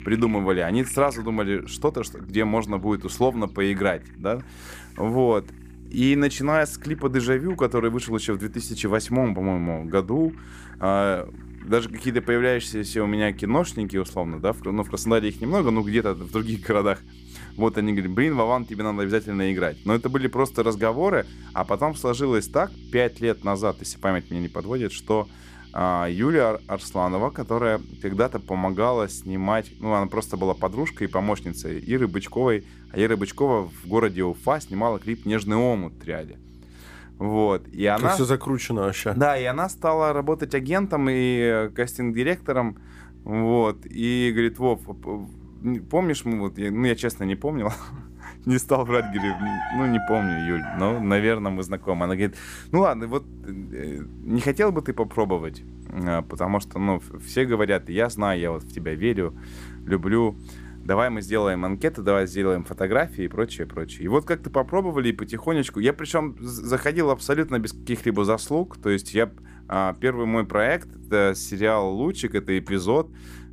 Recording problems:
animal sounds; noticeable; throughout; 20 dB below the speech
electrical hum; faint; throughout; 60 Hz, 30 dB below the speech

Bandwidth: 15 kHz